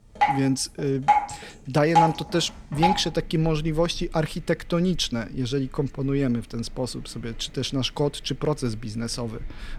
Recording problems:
rain or running water; very loud; throughout; 2 dB above the speech

